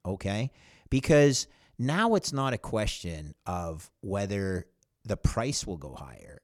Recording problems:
none

